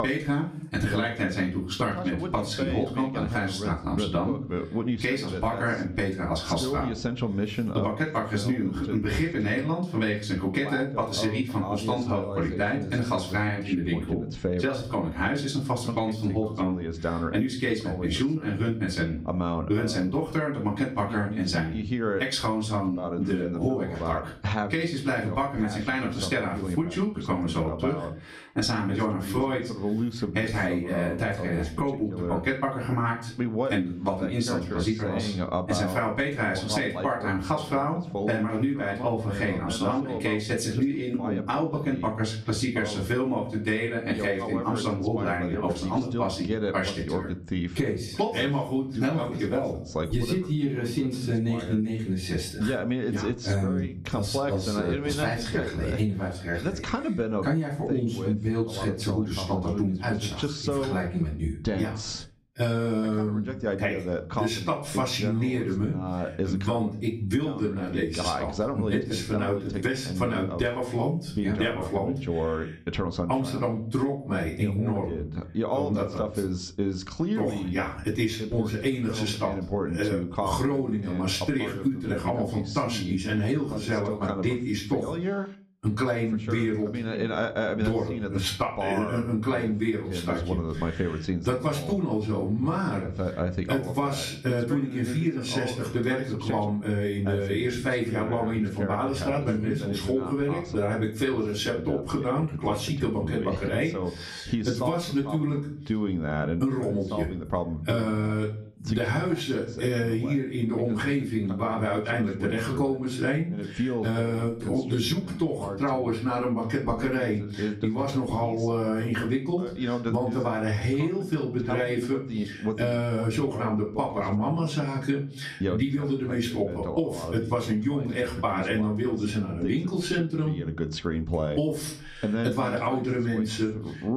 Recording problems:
off-mic speech; far
room echo; very slight; dies away in 0.3 s
squashed, flat; somewhat, background pumping
voice in the background; loud; throughout; 6 dB below the speech

